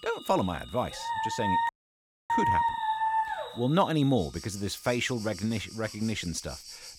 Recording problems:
animal sounds; noticeable; throughout; 15 dB below the speech
high-pitched whine; faint; throughout; 8 kHz, 35 dB below the speech
household noises; faint; throughout; 25 dB below the speech
dog barking; loud; from 1 to 3.5 s; peak 5 dB above the speech
audio cutting out; at 1.5 s for 0.5 s

